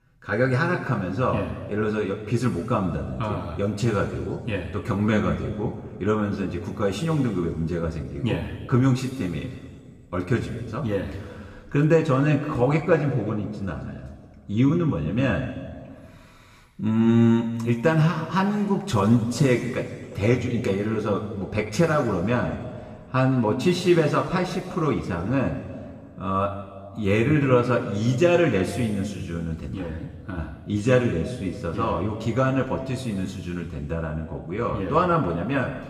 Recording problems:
room echo; noticeable; dies away in 1.8 s
off-mic speech; somewhat distant

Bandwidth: 14.5 kHz